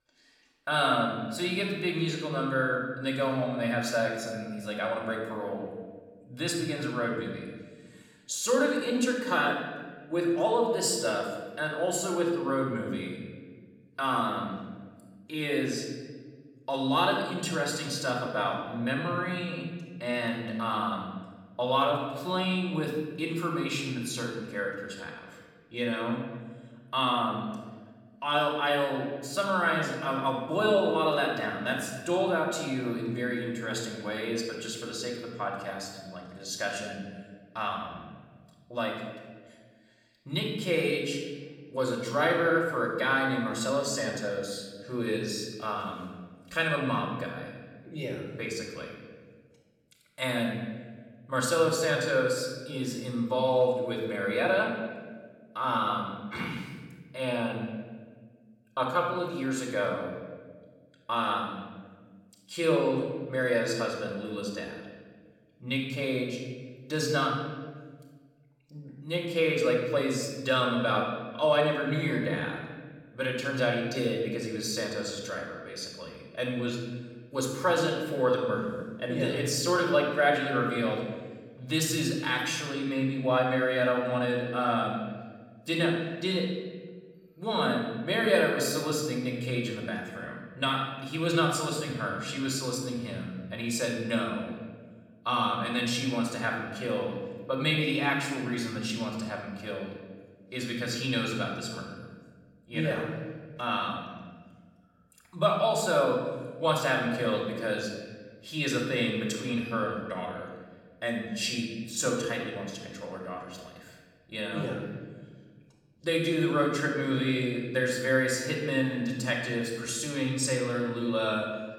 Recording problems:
off-mic speech; far
room echo; noticeable; dies away in 1.2 s

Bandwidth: 16.5 kHz